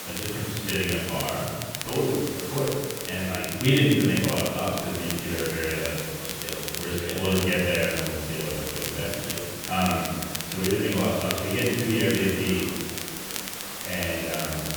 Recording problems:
room echo; strong; dies away in 1.5 s
off-mic speech; far
muffled; slightly; fading above 3.5 kHz
hiss; loud; throughout; 7 dB below the speech
crackle, like an old record; loud; 8 dB below the speech
voice in the background; faint; throughout; 20 dB below the speech

